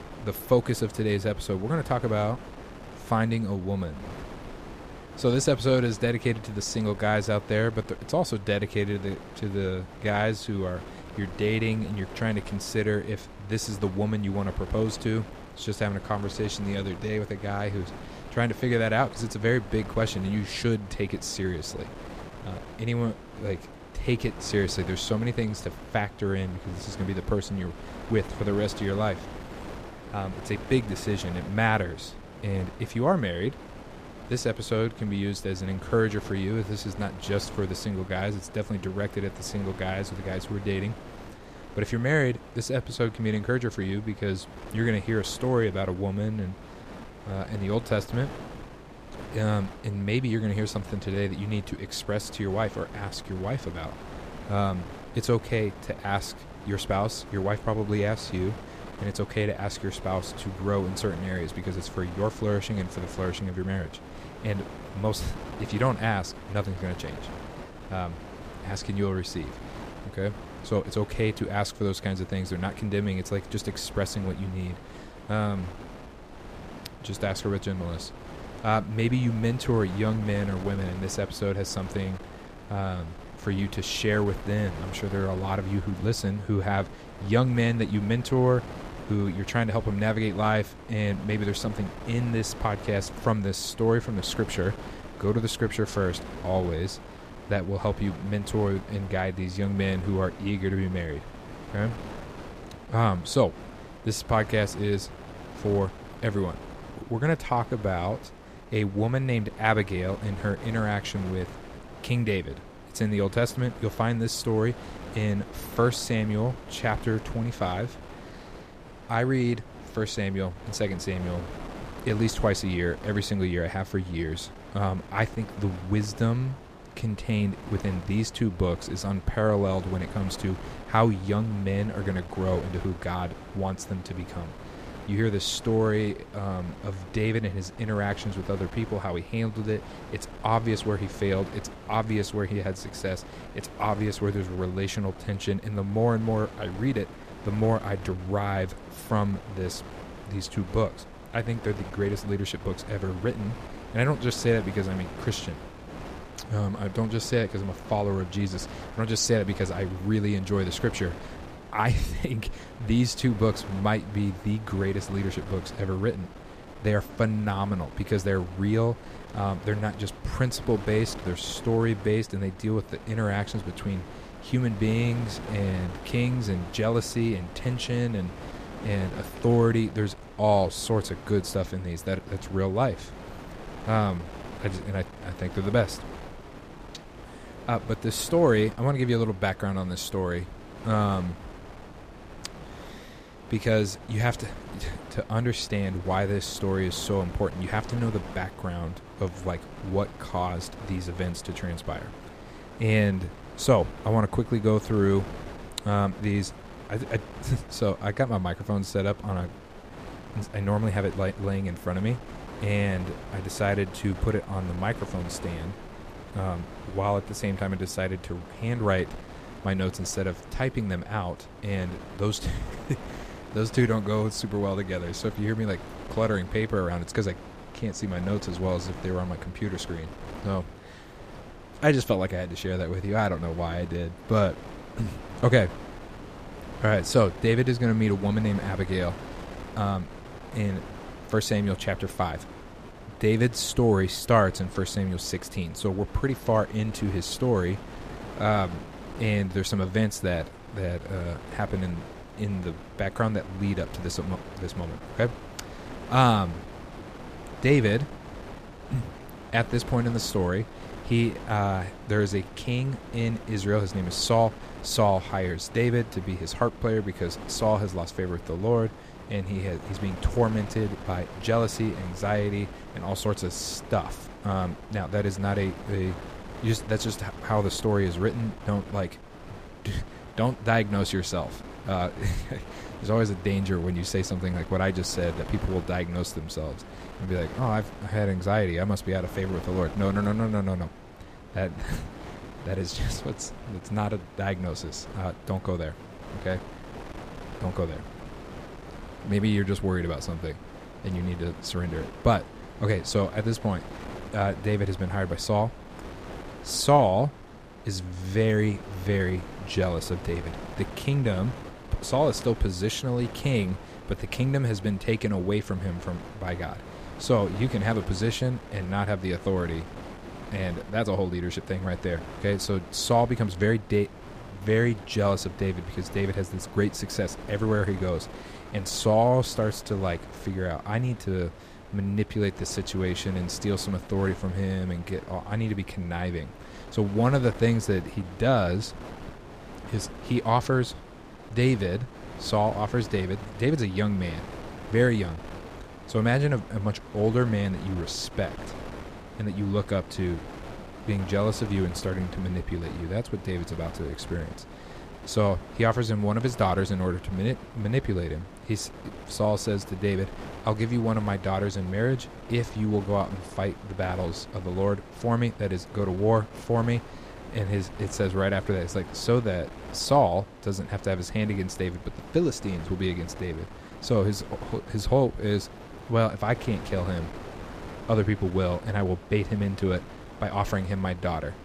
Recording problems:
wind noise on the microphone; occasional gusts; 15 dB below the speech

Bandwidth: 14.5 kHz